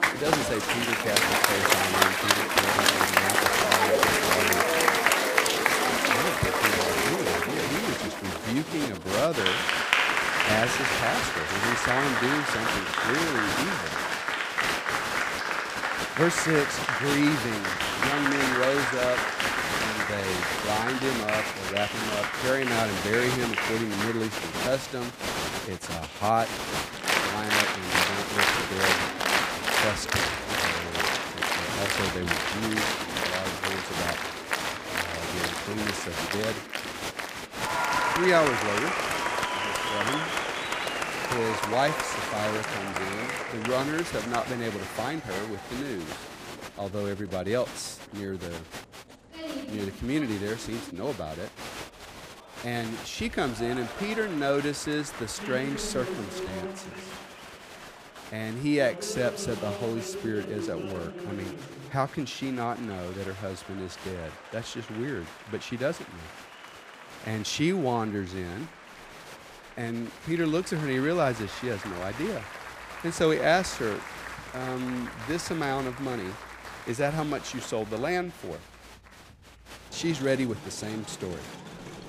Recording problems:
crowd noise; very loud; throughout; 4 dB above the speech

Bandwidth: 15 kHz